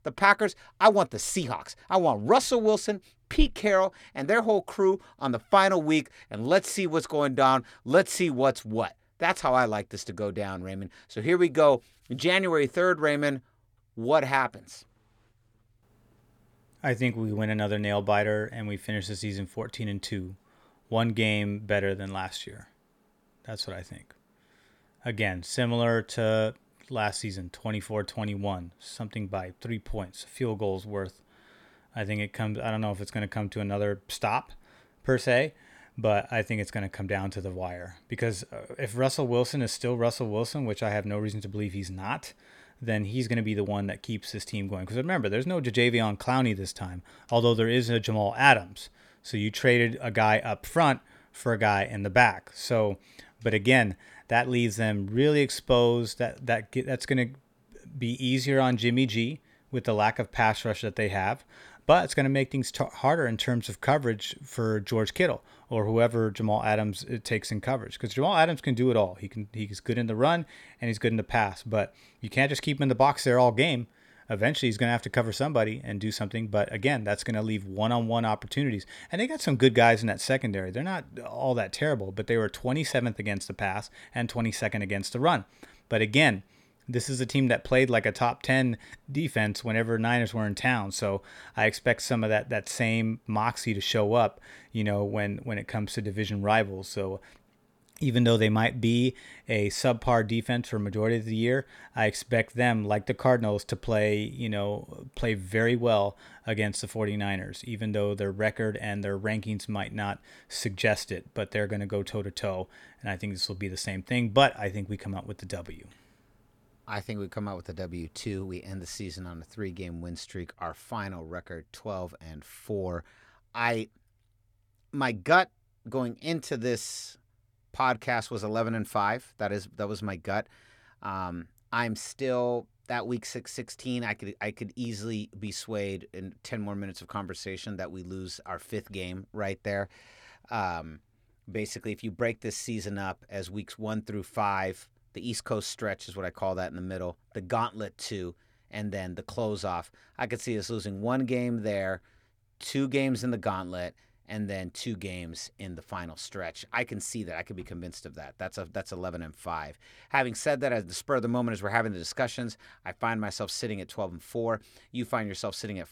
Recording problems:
none

